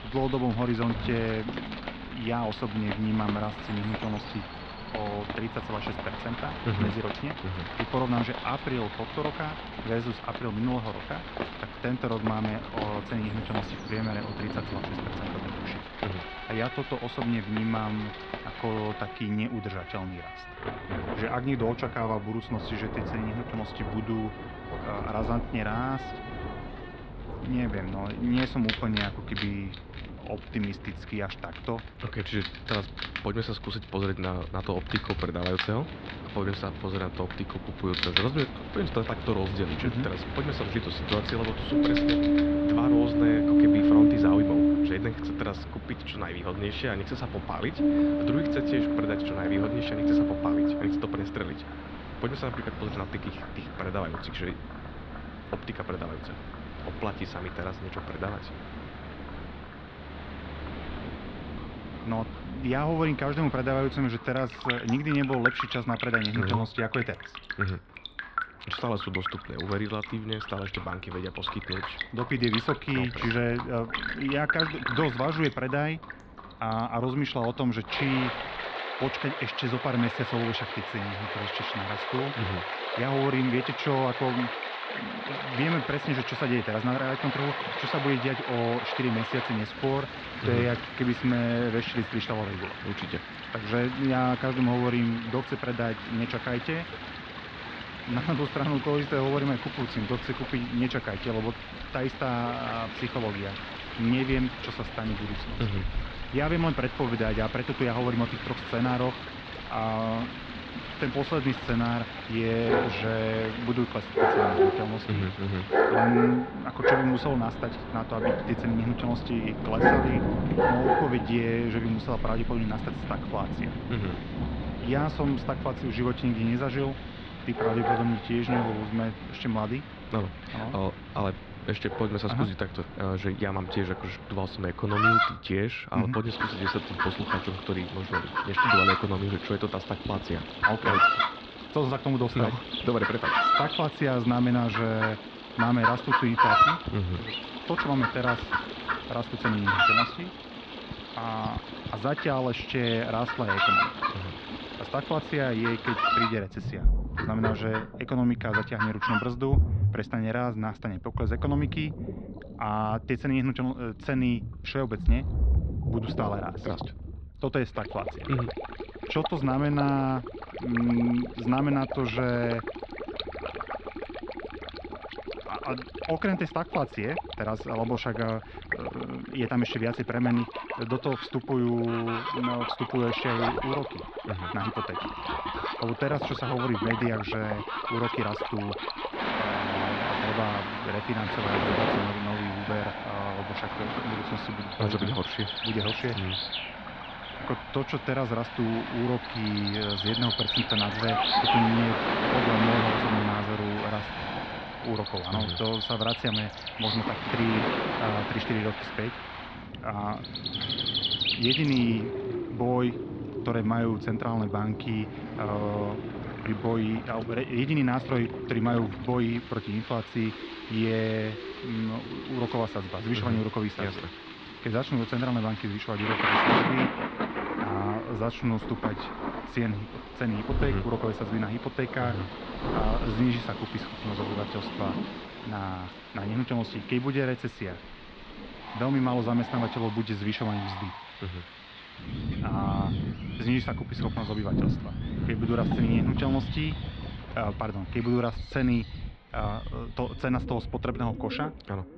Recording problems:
muffled; slightly; fading above 4 kHz
animal sounds; loud; throughout; 2 dB below the speech
rain or running water; loud; throughout; 3 dB below the speech

